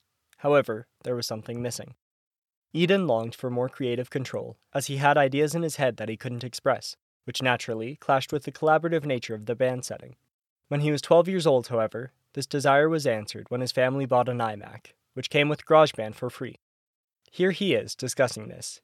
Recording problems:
none

